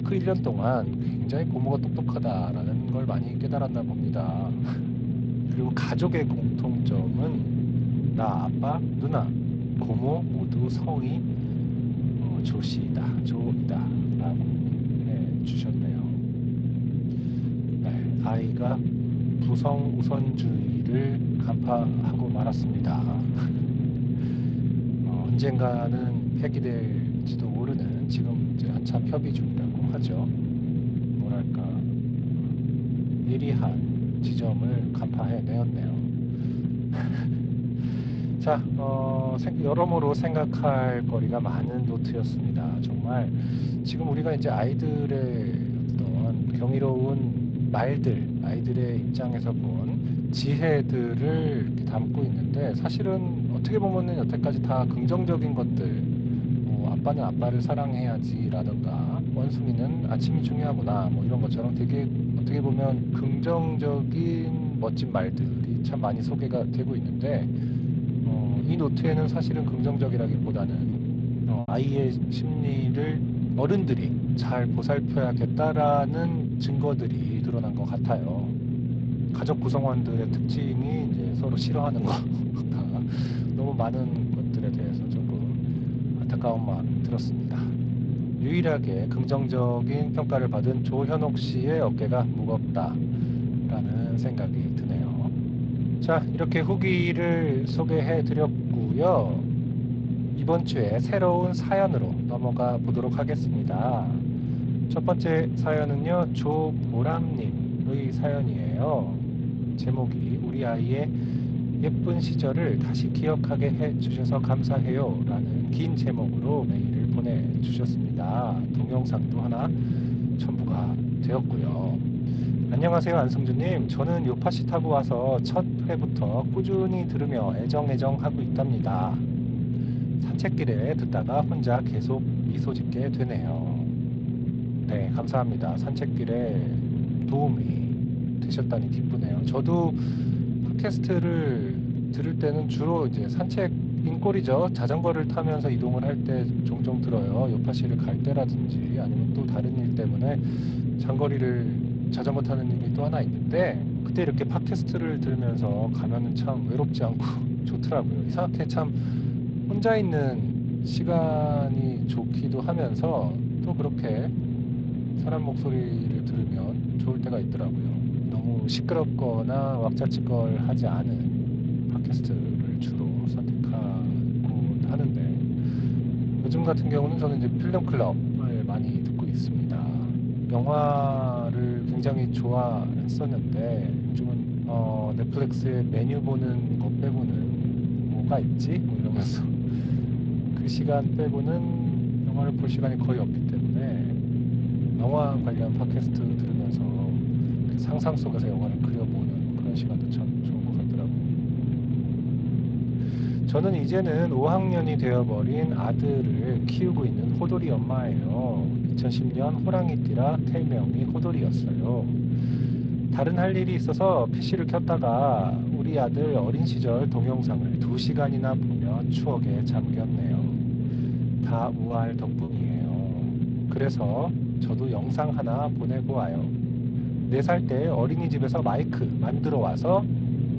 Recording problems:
garbled, watery; slightly
low rumble; loud; throughout; 4 dB below the speech
choppy; occasionally; at 1:11 and at 3:42; 4% of the speech affected

